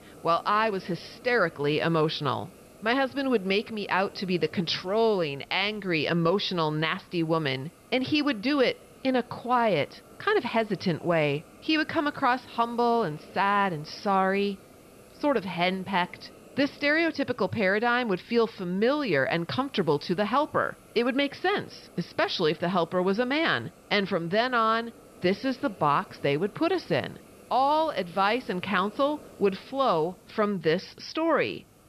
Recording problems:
high frequencies cut off; noticeable; nothing above 5.5 kHz
hiss; faint; throughout; 25 dB below the speech

